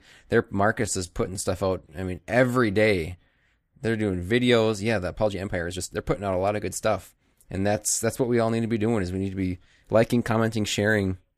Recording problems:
uneven, jittery; strongly; from 1 to 10 s

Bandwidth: 15 kHz